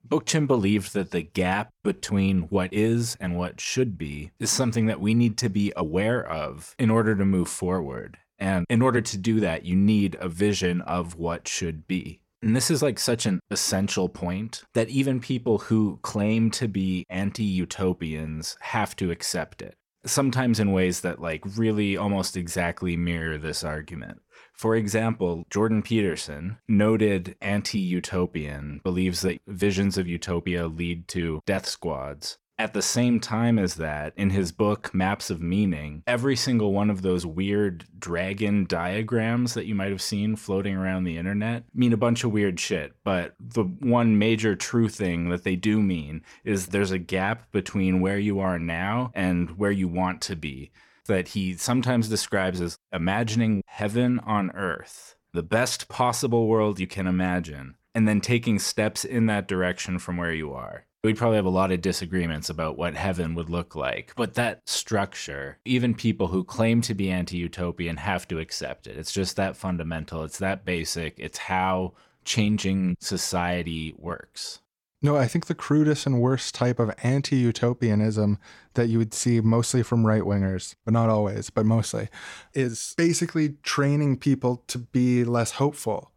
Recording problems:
none

